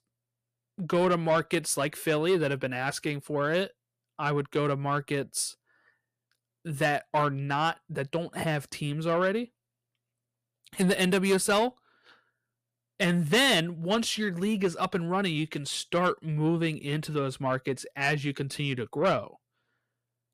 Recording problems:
distortion; slight; 10 dB below the speech

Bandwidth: 14.5 kHz